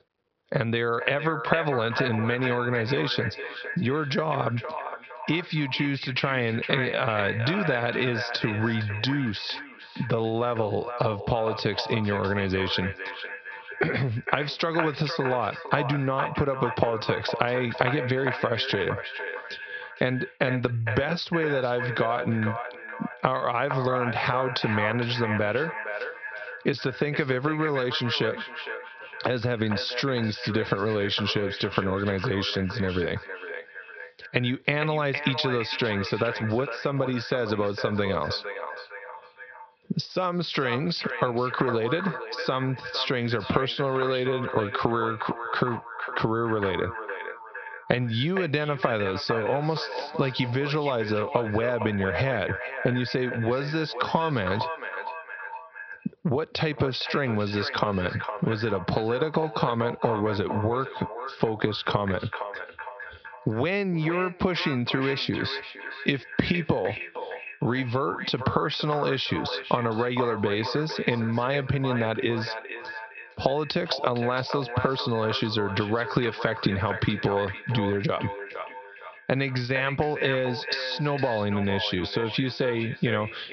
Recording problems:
echo of what is said; strong; throughout; 460 ms later, 8 dB below the speech
high frequencies cut off; noticeable; nothing above 5.5 kHz
squashed, flat; somewhat

